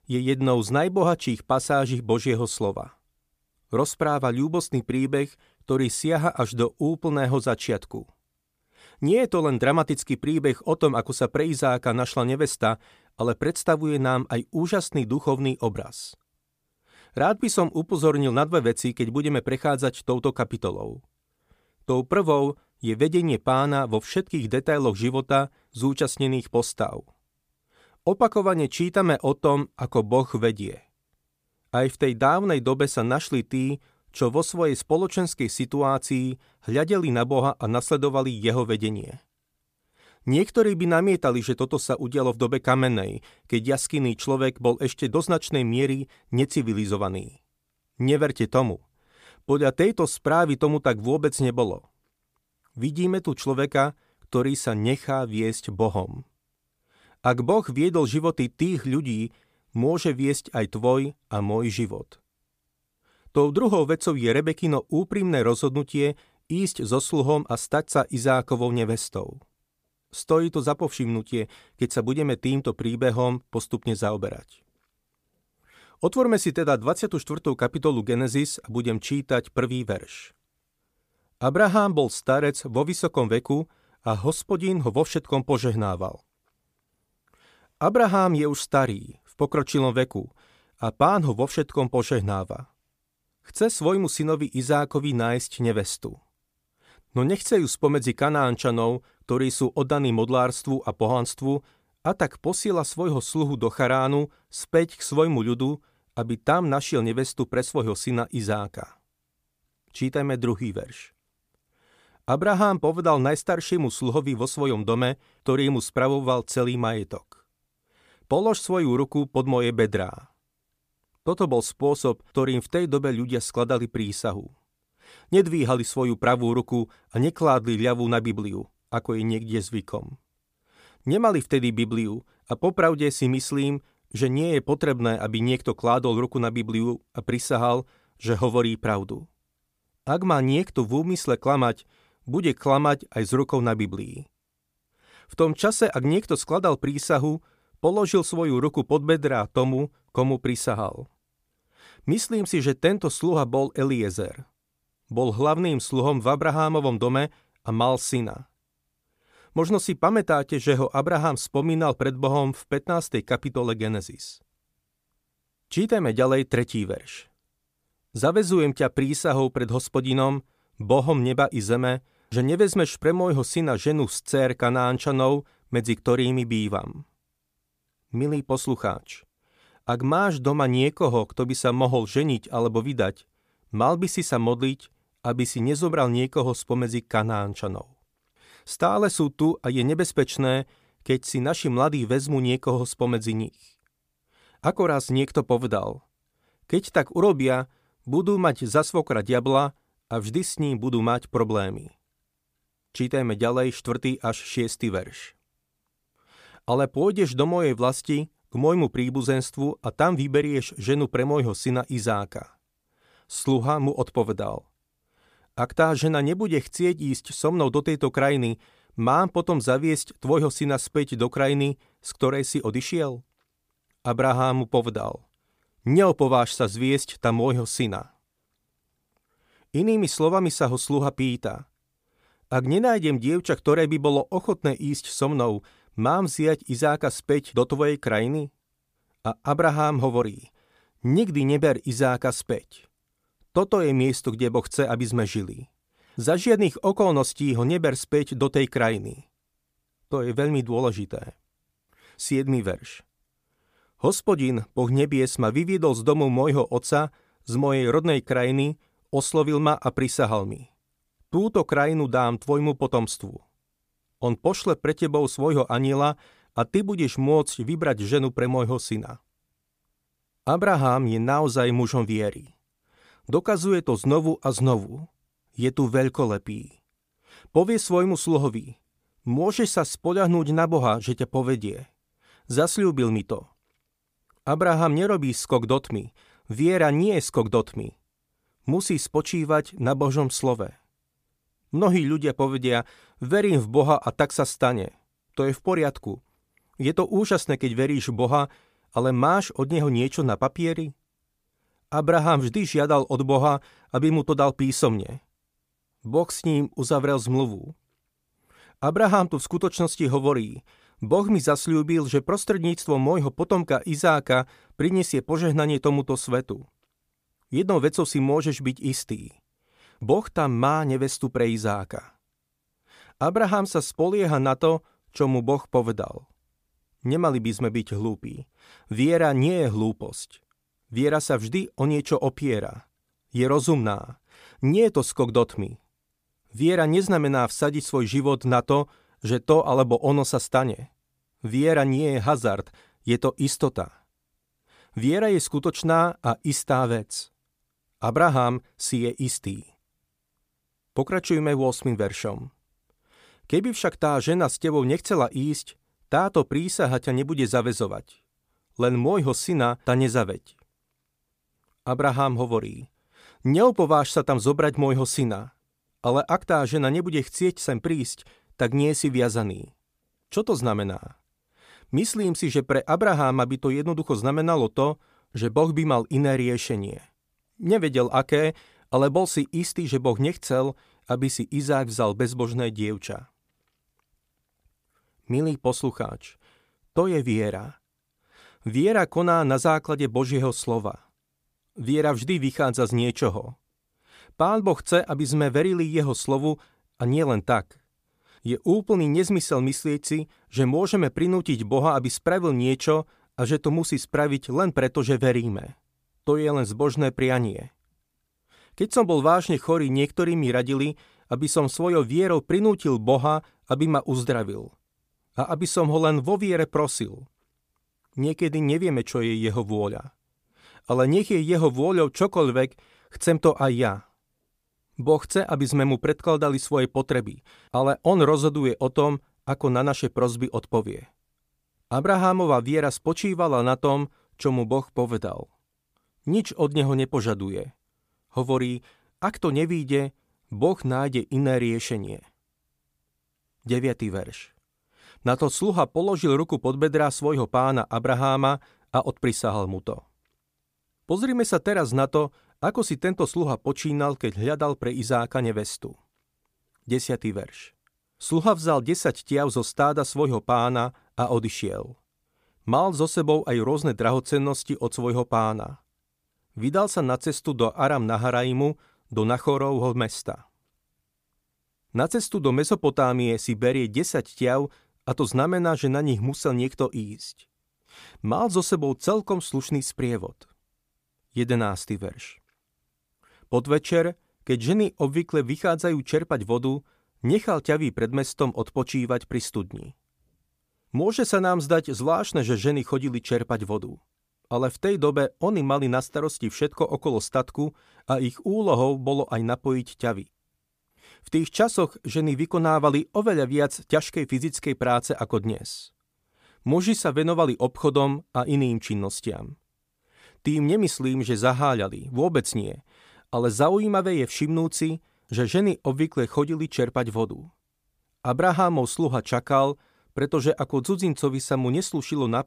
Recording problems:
none

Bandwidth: 15 kHz